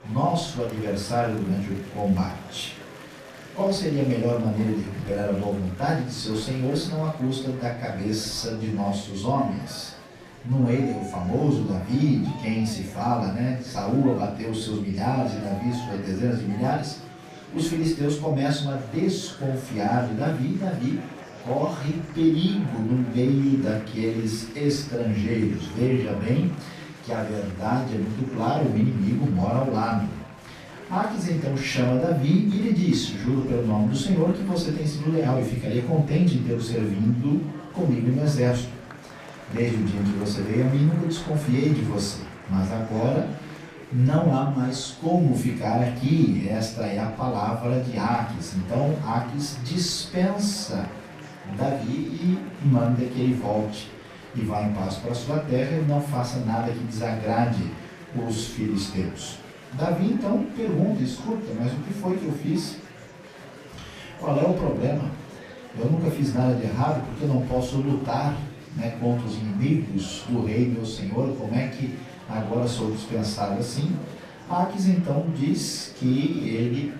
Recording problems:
off-mic speech; far
room echo; noticeable; dies away in 0.5 s
murmuring crowd; noticeable; throughout; 15 dB below the speech

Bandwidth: 14.5 kHz